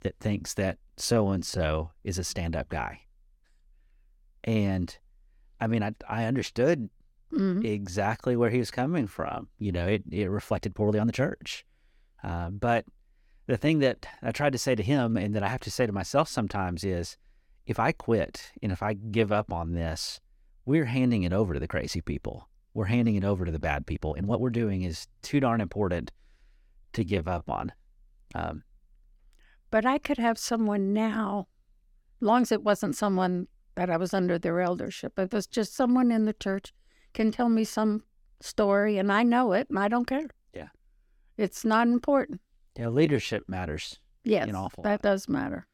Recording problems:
uneven, jittery; strongly; from 1 to 45 s

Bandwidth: 17.5 kHz